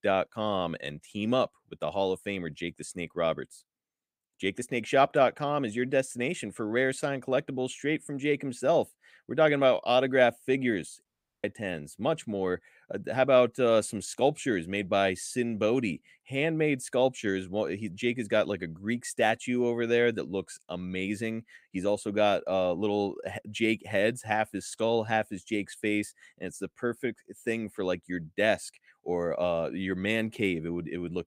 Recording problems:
audio cutting out; at 11 s

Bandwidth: 15.5 kHz